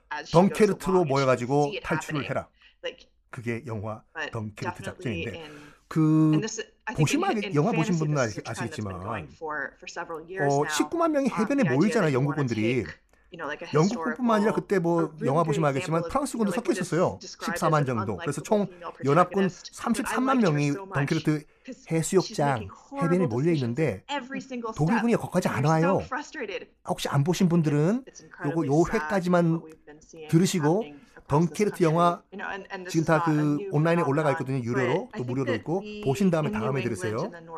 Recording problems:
voice in the background; loud; throughout; 10 dB below the speech

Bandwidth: 14.5 kHz